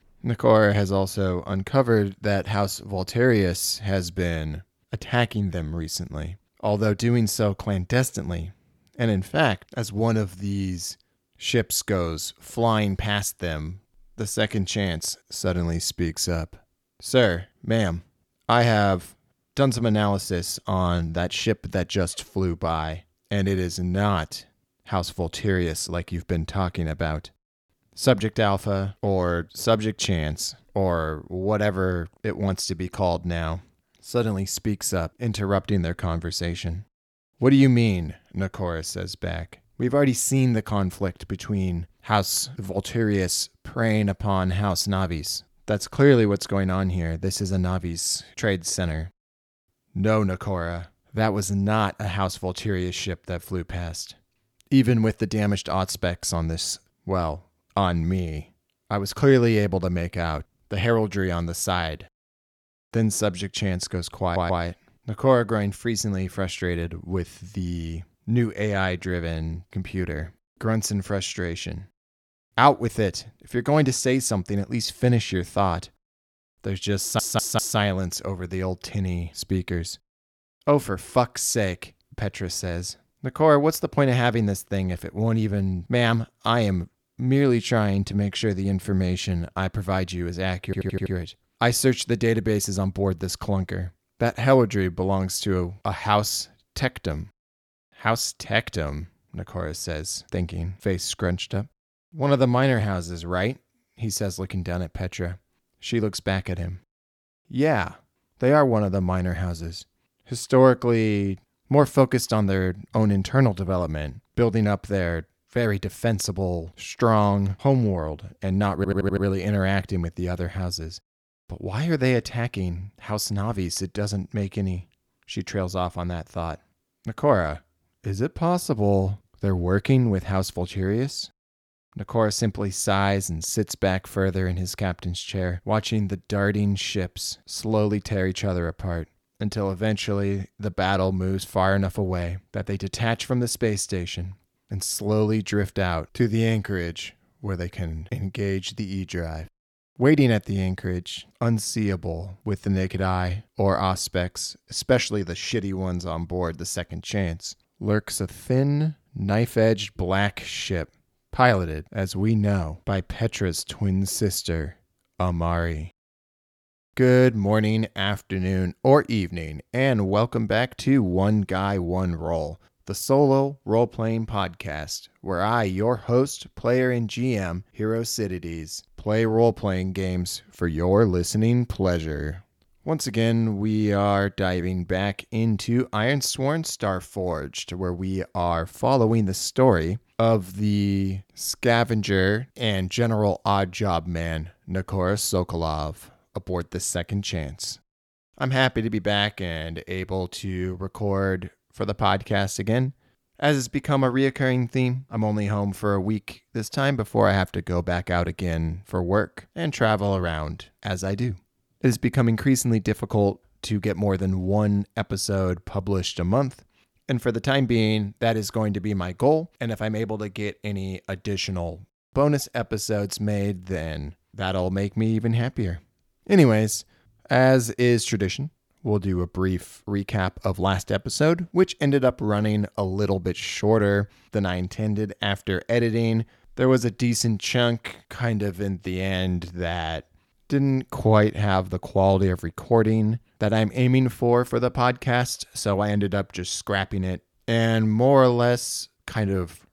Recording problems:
audio stuttering; 4 times, first at 1:04

